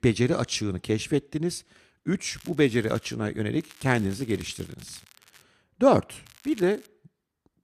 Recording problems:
crackling; faint; at 2.5 s, from 3.5 to 5.5 s and at 6.5 s; 25 dB below the speech

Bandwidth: 14.5 kHz